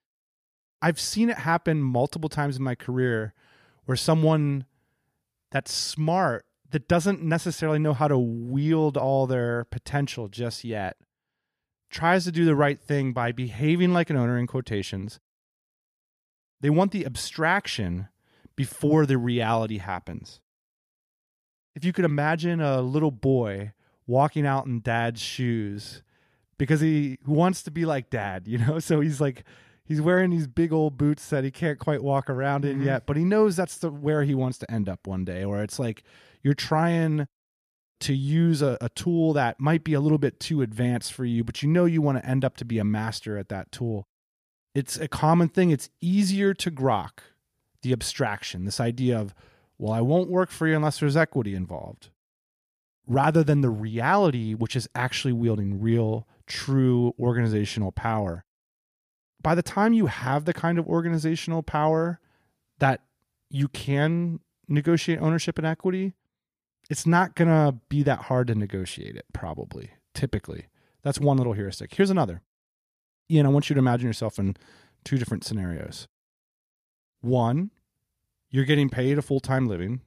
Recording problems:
none

